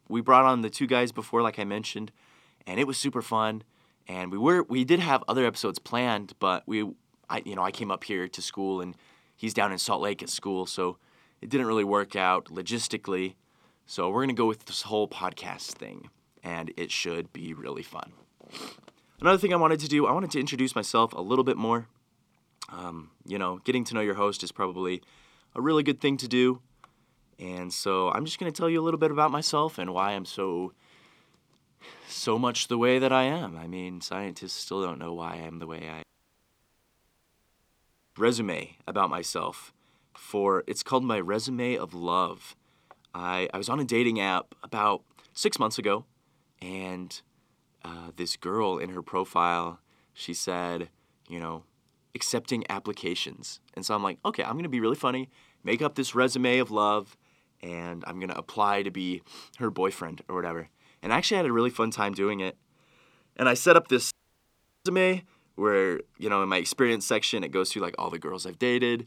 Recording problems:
audio cutting out; at 36 s for 2 s and at 1:04 for 0.5 s

